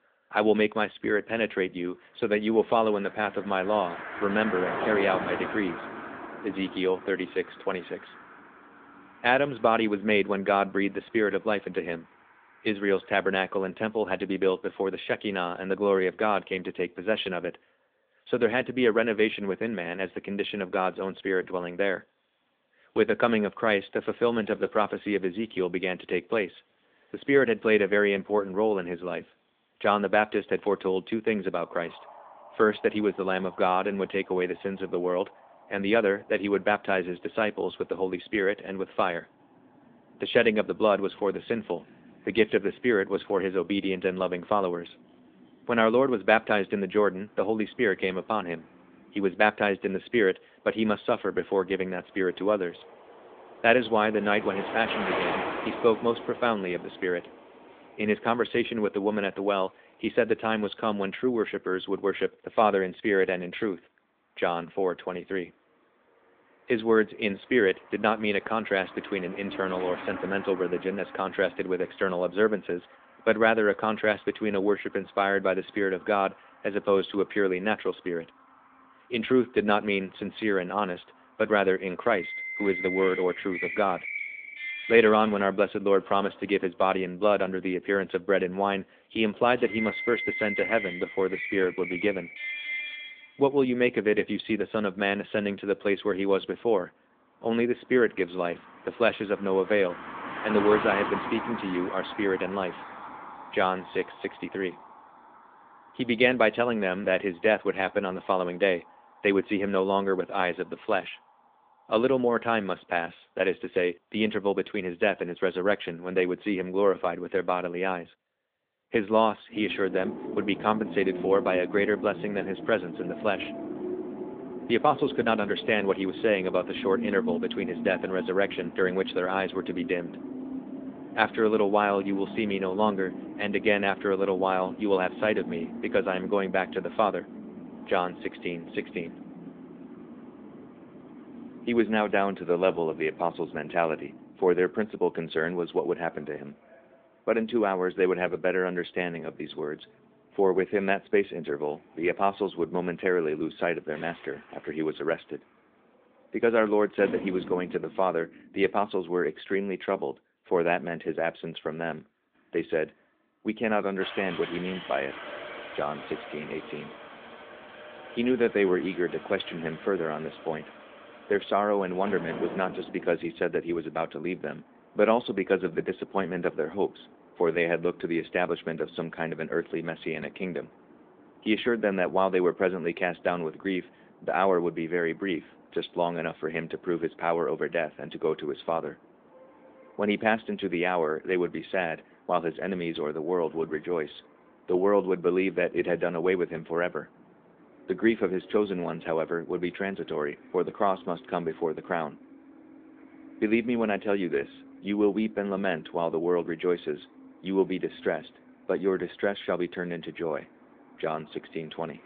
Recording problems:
phone-call audio
traffic noise; noticeable; throughout; 10 dB below the speech

